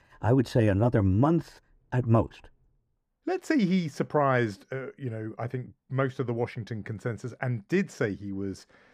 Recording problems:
muffled; slightly; fading above 2.5 kHz

